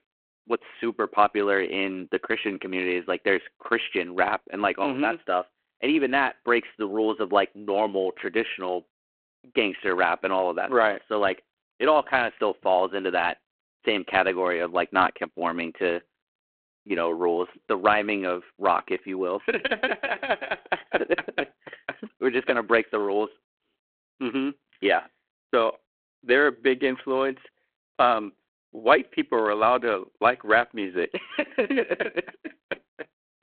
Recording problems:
phone-call audio

